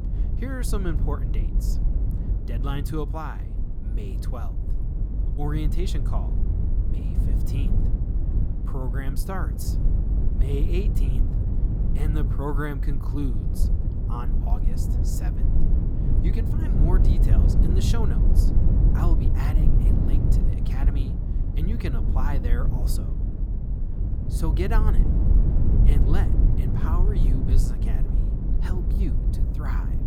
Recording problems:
low rumble; loud; throughout; 2 dB below the speech

